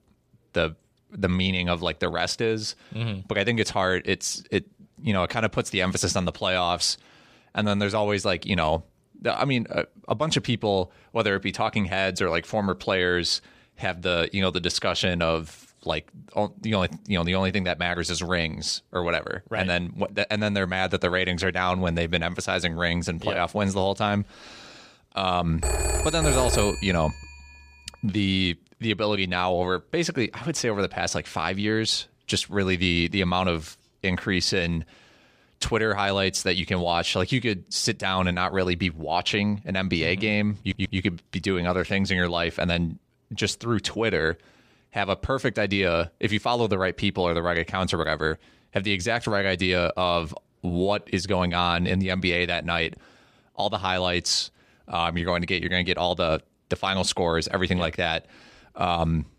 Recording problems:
phone ringing; loud; from 26 to 27 s; peak 1 dB above the speech
audio stuttering; at 41 s

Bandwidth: 14.5 kHz